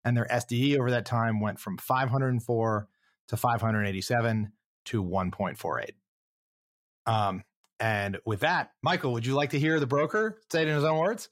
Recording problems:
none

